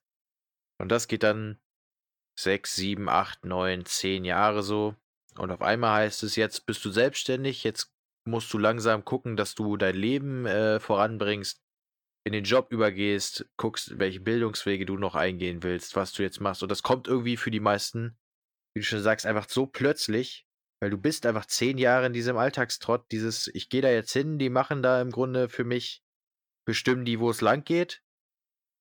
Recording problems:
none

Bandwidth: 18.5 kHz